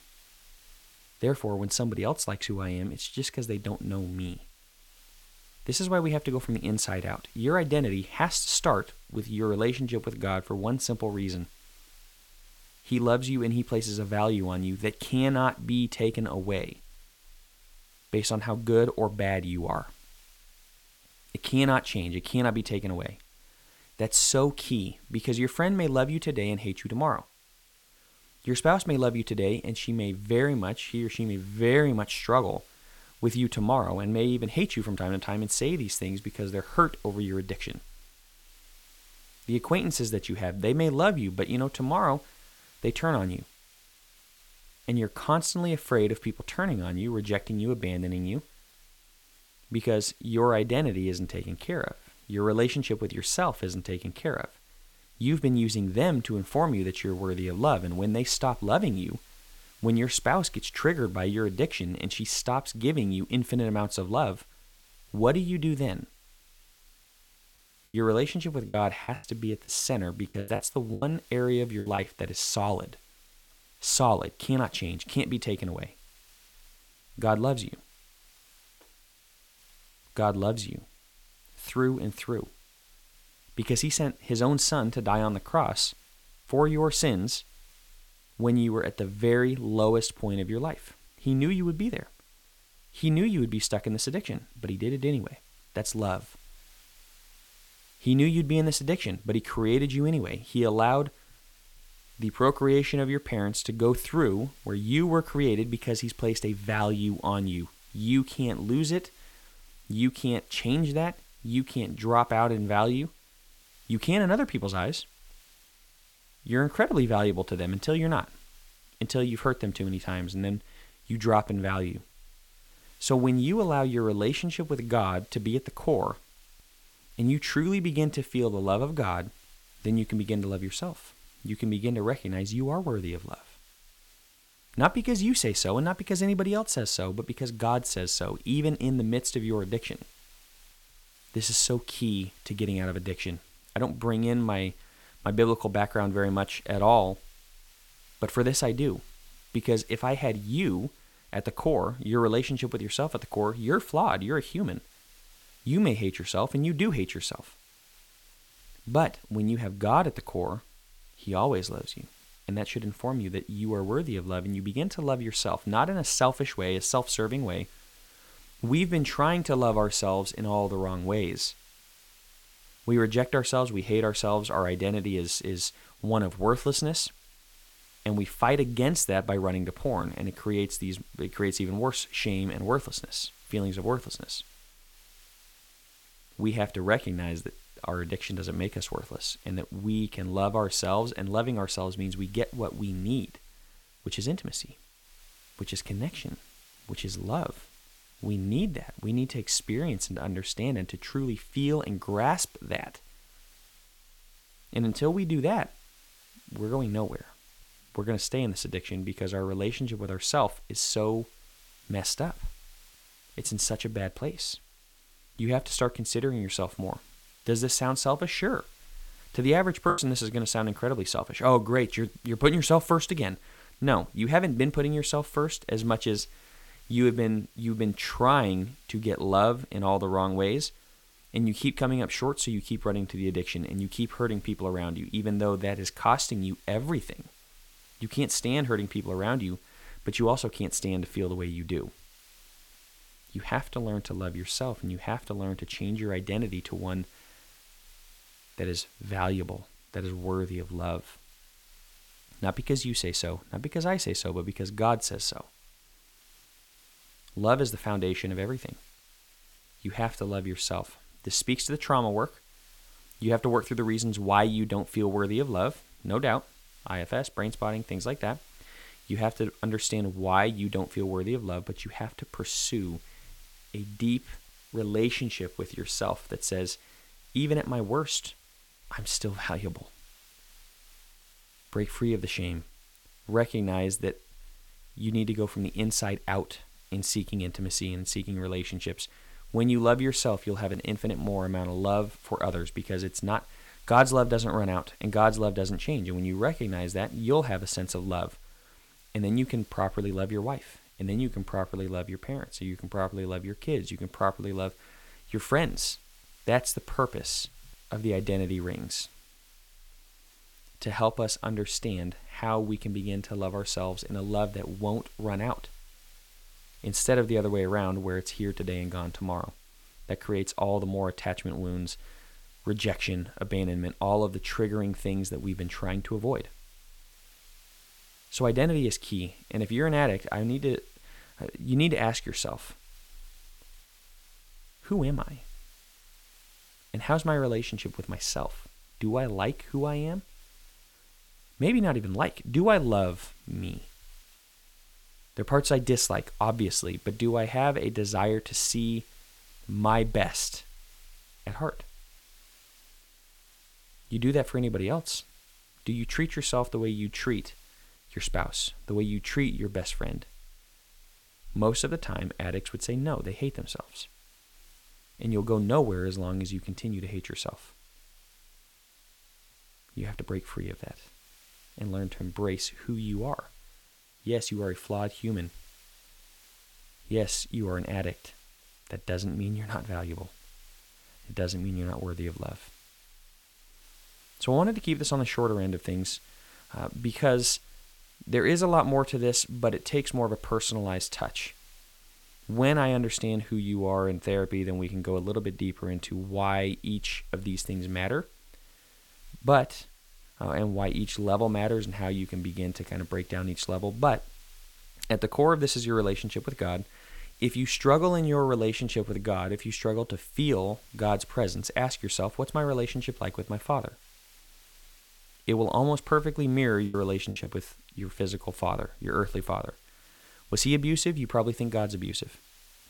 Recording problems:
hiss; faint; throughout; 25 dB below the speech
choppy; very; from 1:09 to 1:12, at 3:40 and at 6:57; 11% of the speech affected

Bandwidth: 17 kHz